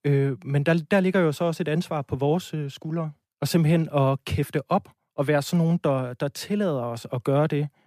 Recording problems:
none

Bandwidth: 14.5 kHz